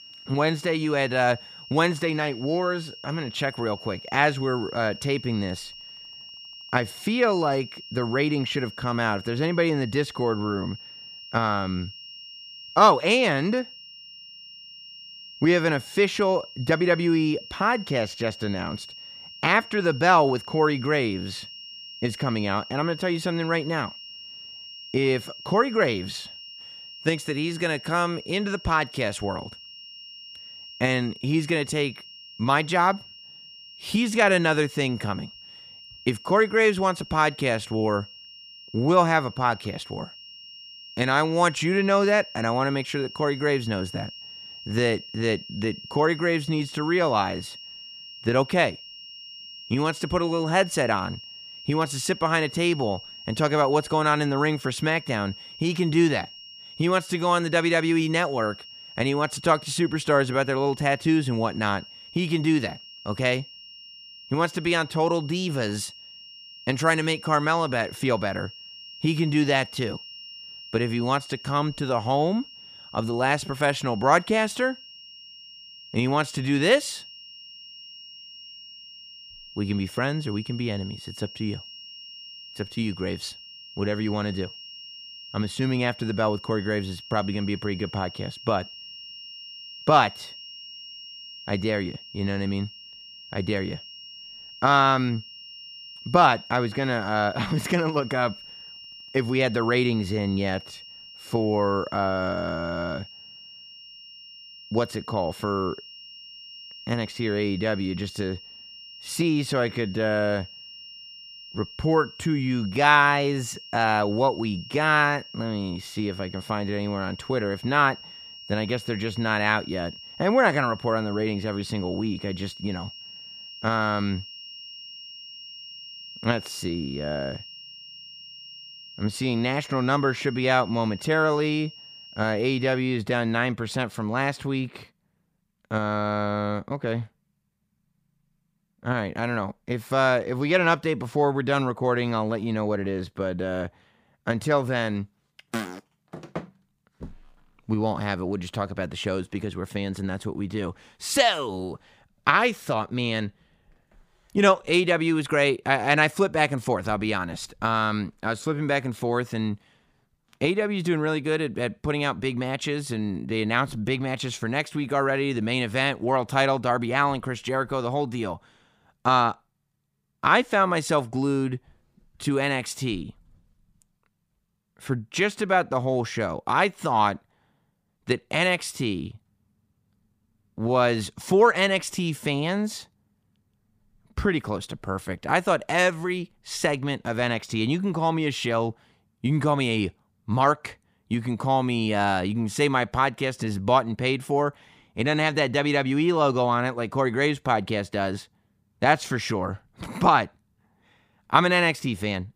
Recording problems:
high-pitched whine; noticeable; until 2:13; 3 kHz, 15 dB below the speech

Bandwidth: 15 kHz